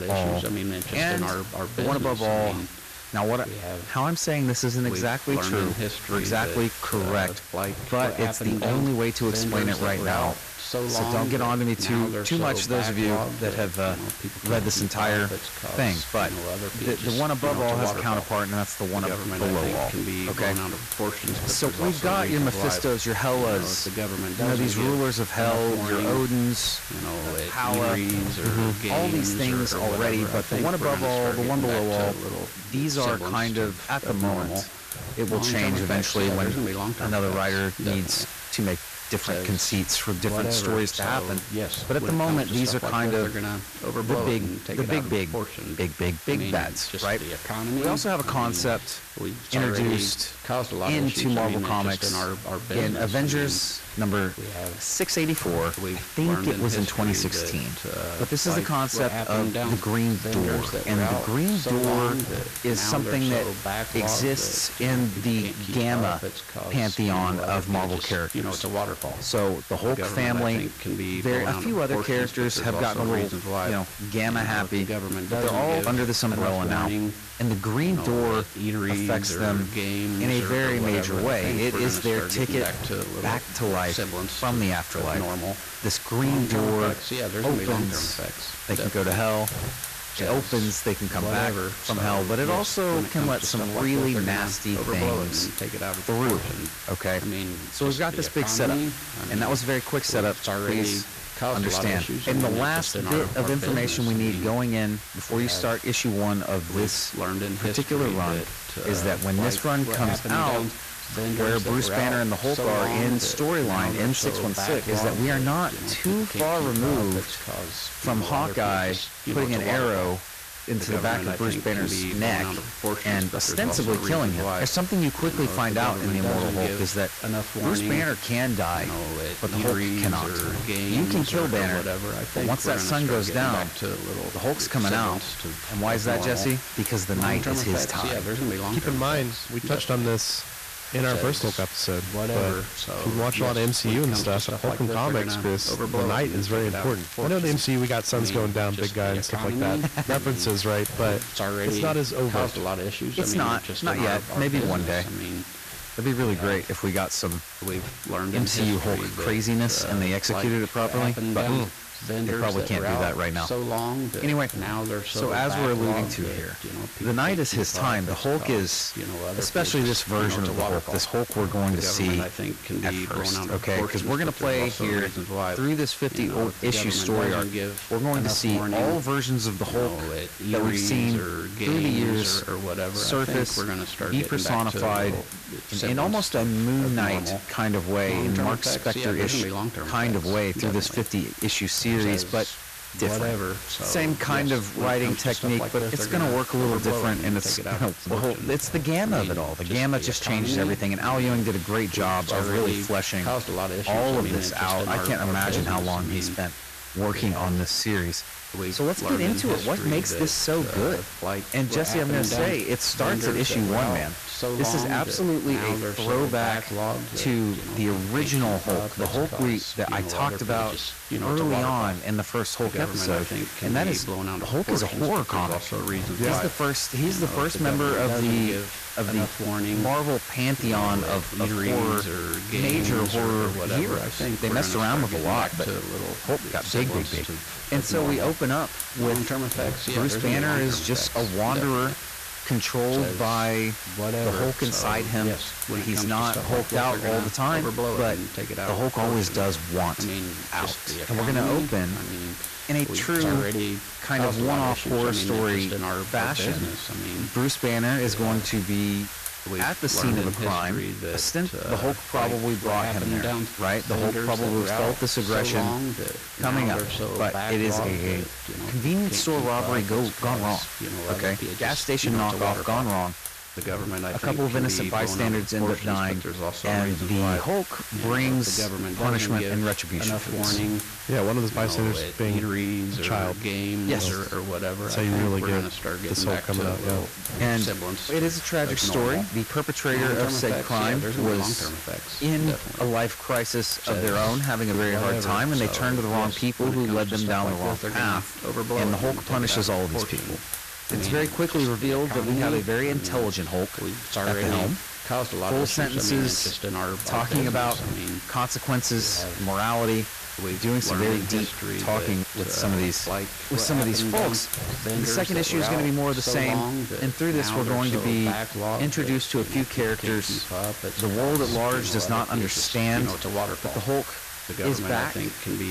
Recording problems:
distortion; slight; 13% of the sound clipped
voice in the background; loud; throughout; 5 dB below the speech
hiss; loud; throughout; 9 dB below the speech
crackling; noticeable; from 2:27 to 2:28; 15 dB below the speech

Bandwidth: 14.5 kHz